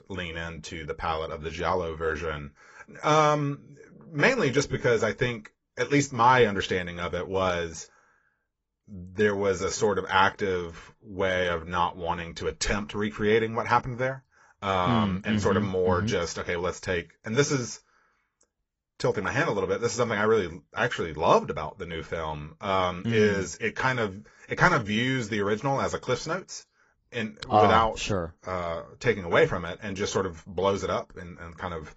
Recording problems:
garbled, watery; badly; nothing above 7.5 kHz

